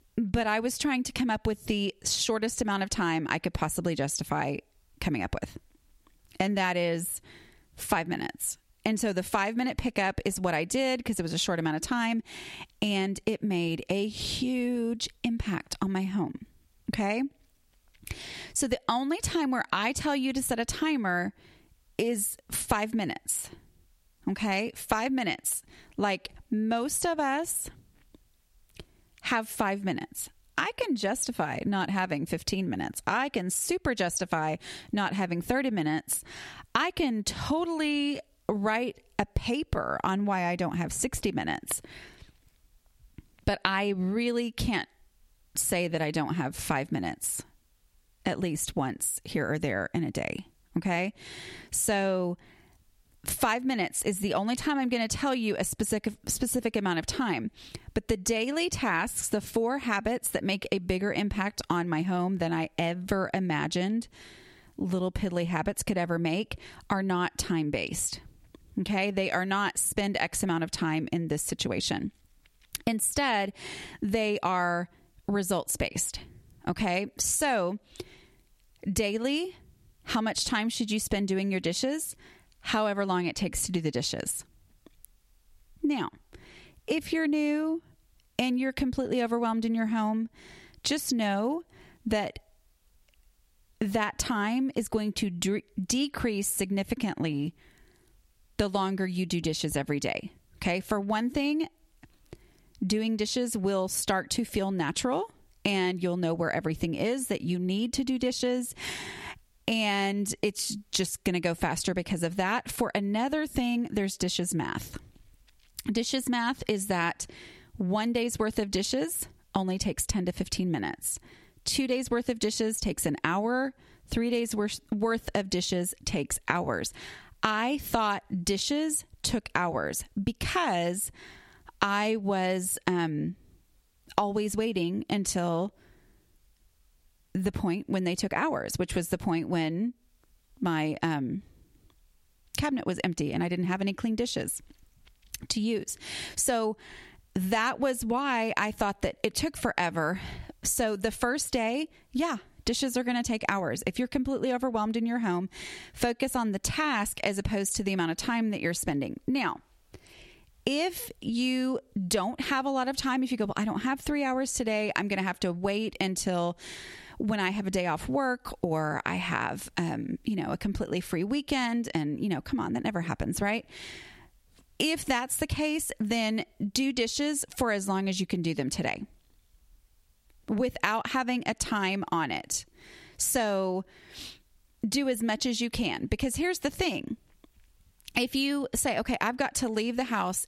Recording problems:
squashed, flat; somewhat

